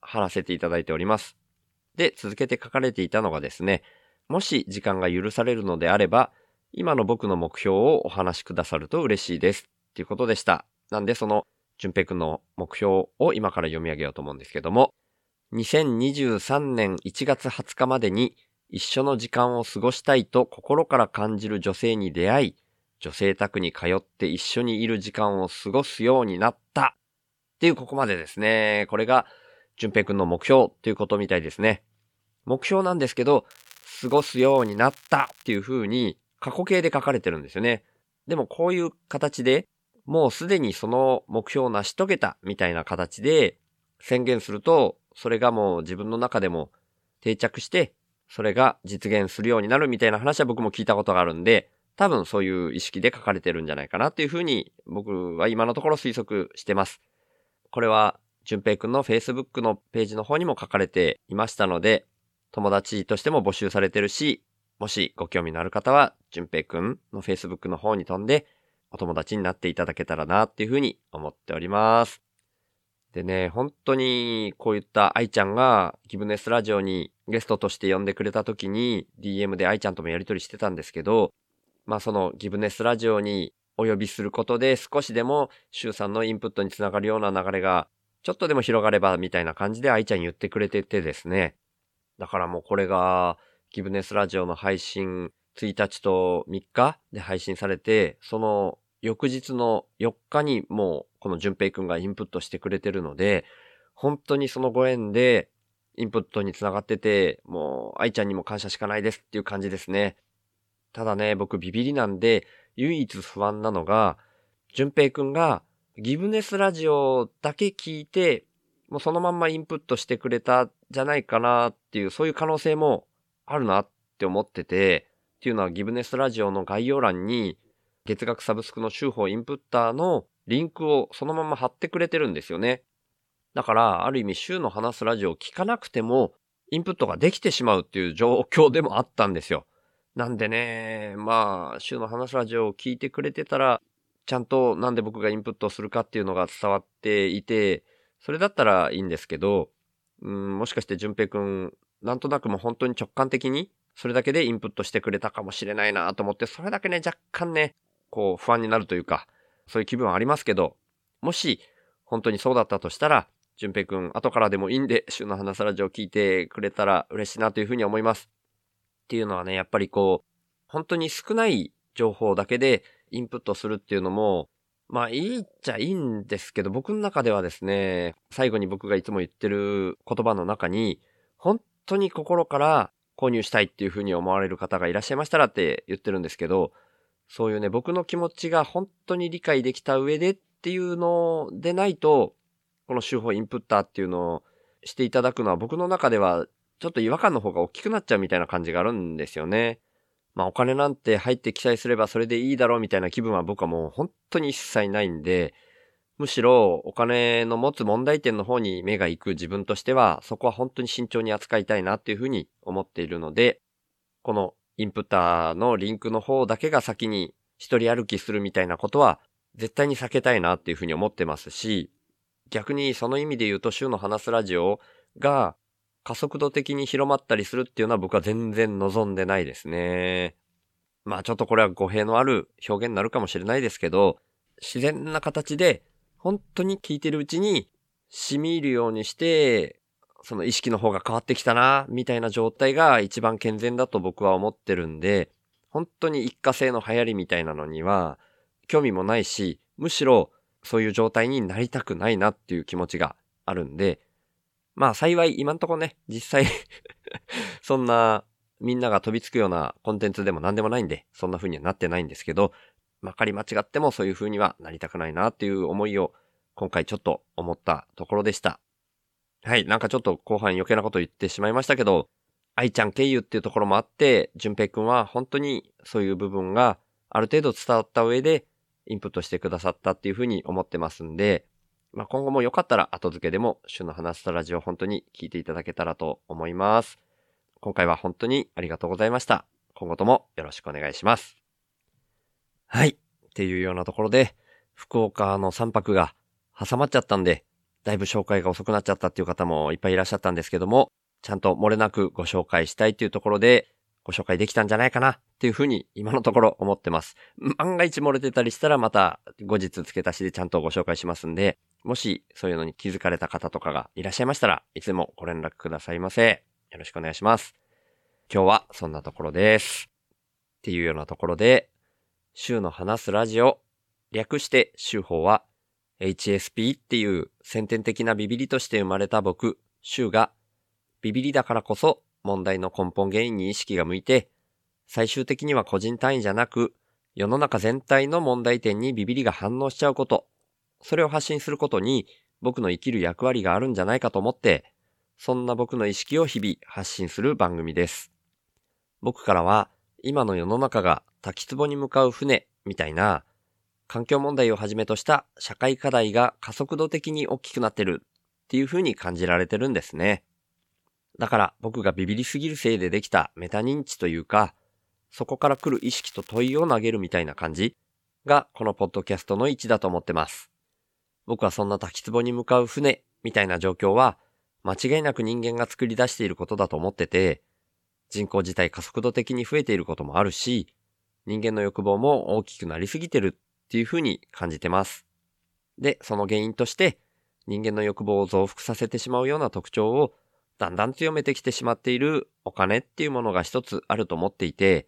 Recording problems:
crackling; faint; from 34 to 36 s, at 5:46 and from 6:05 to 6:07; 25 dB below the speech

